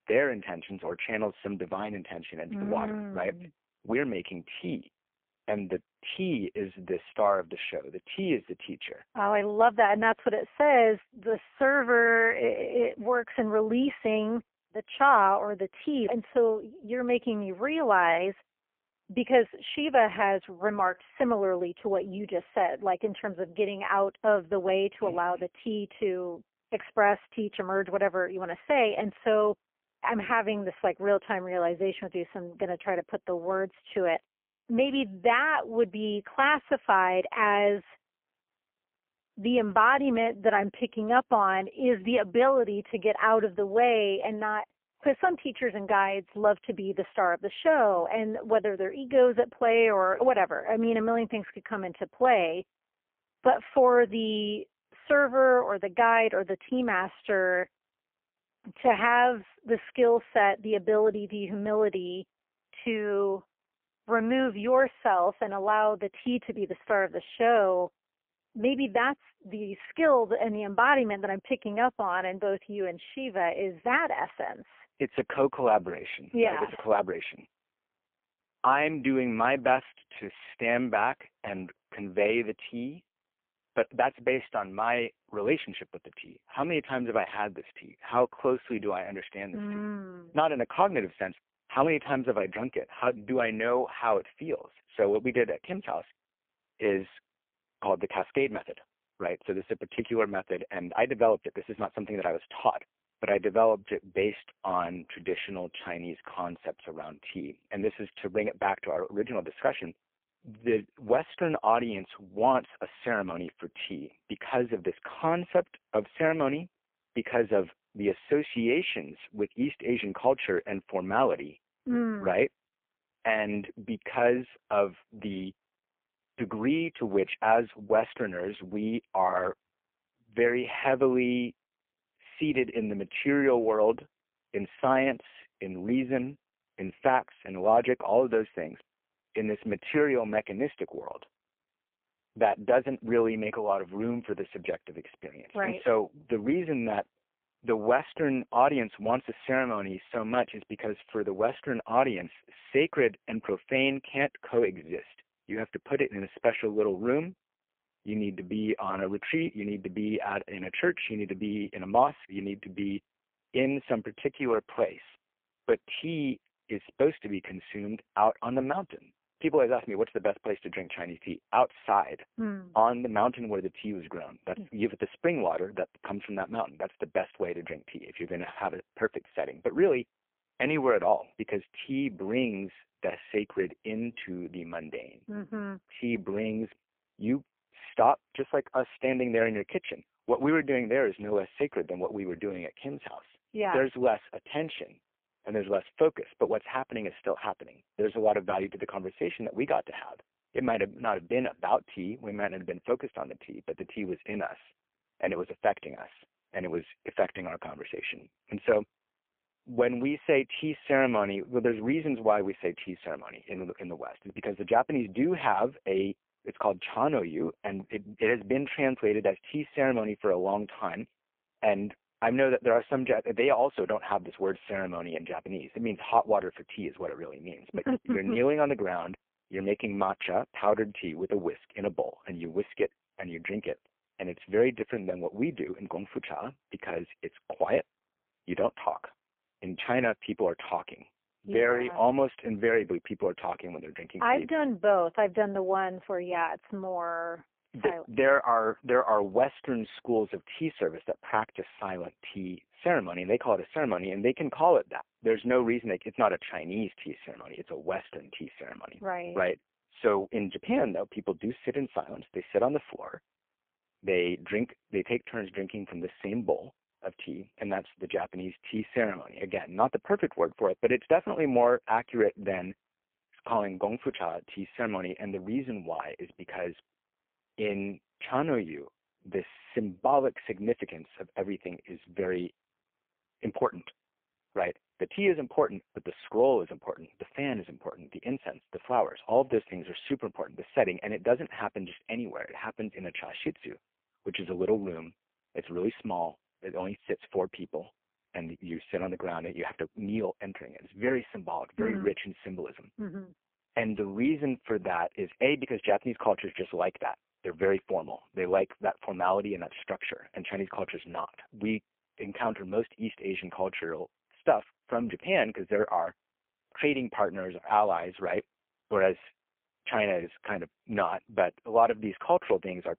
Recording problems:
phone-call audio; poor line

